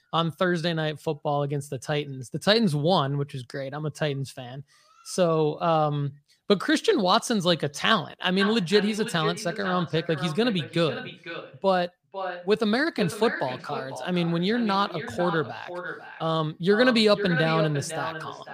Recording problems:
echo of what is said; strong; from 8.5 s on; 500 ms later, 9 dB below the speech

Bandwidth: 15 kHz